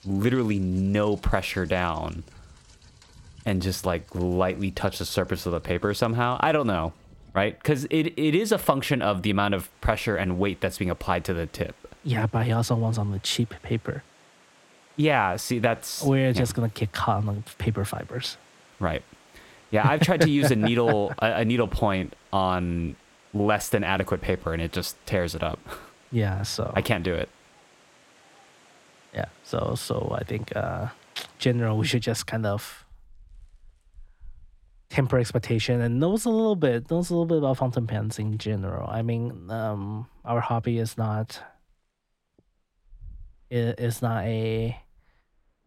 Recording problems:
rain or running water; faint; throughout; 30 dB below the speech

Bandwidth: 16.5 kHz